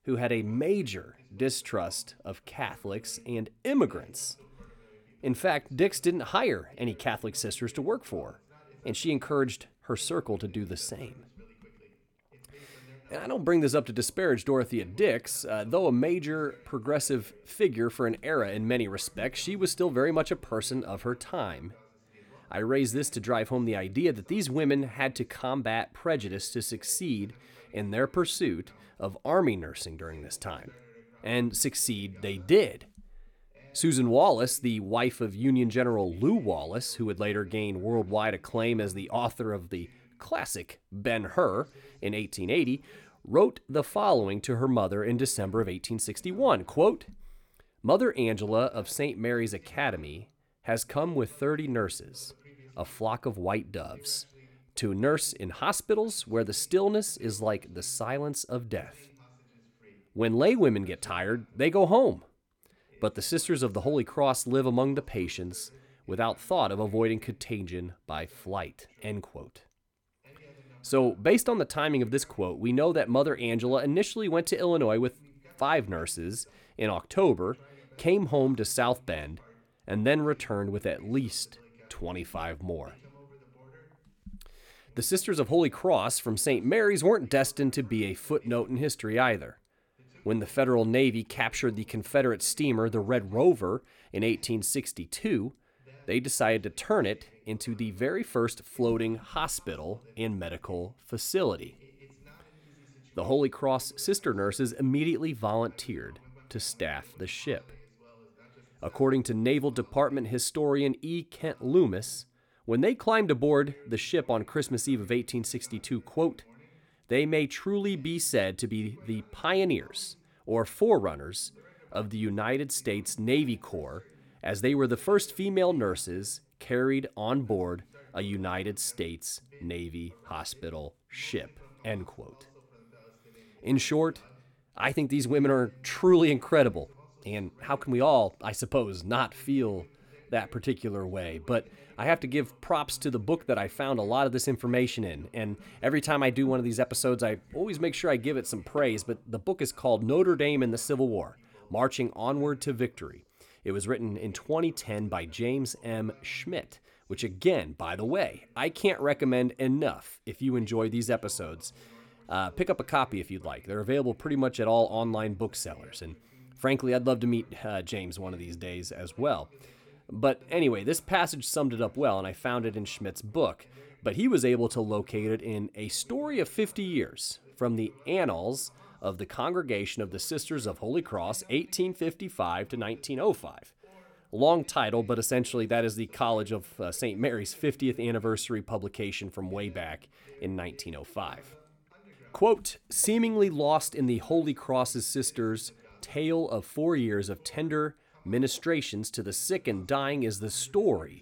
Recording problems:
voice in the background; faint; throughout; 30 dB below the speech

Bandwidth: 17.5 kHz